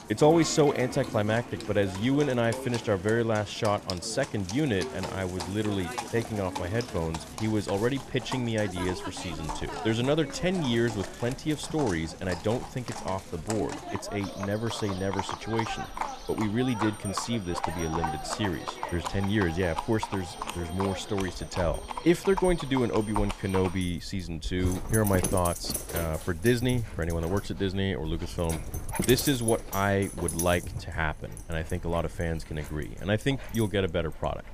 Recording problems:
animal sounds; loud; throughout; 8 dB below the speech
household noises; faint; throughout; 20 dB below the speech

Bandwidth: 14.5 kHz